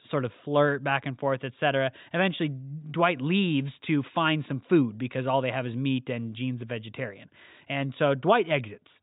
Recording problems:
high frequencies cut off; severe; nothing above 4 kHz

